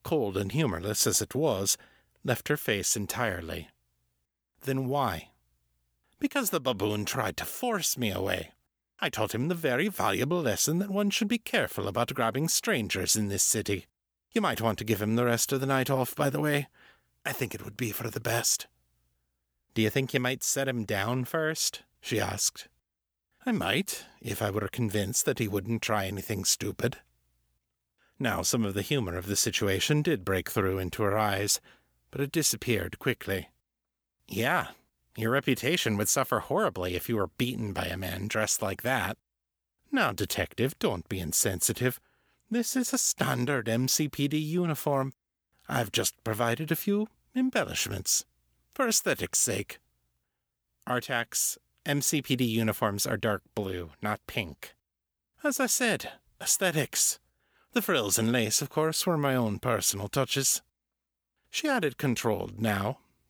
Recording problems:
none

